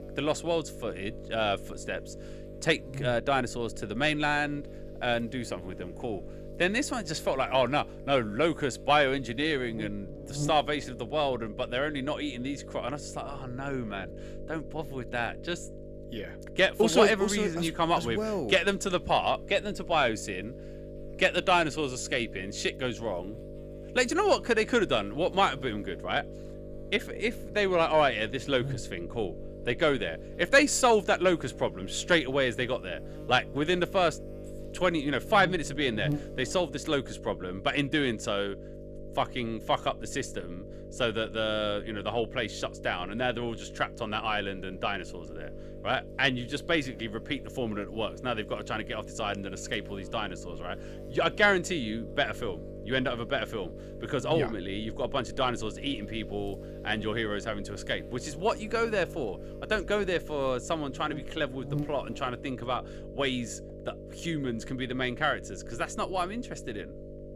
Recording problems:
electrical hum; noticeable; throughout; 50 Hz, 15 dB below the speech

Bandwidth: 14.5 kHz